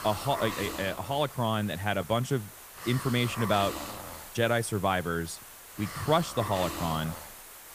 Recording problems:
hiss; loud; throughout; 10 dB below the speech

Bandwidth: 15 kHz